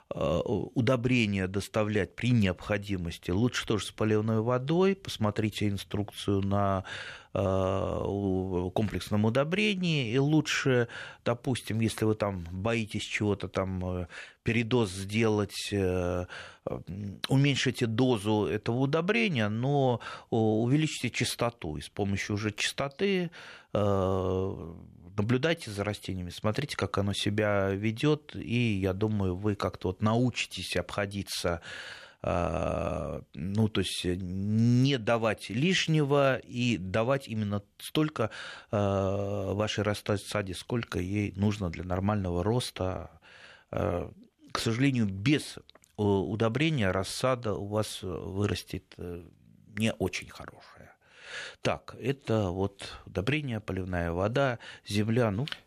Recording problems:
none

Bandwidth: 14 kHz